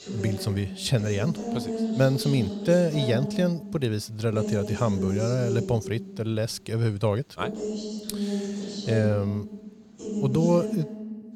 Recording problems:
voice in the background; loud; throughout; 6 dB below the speech

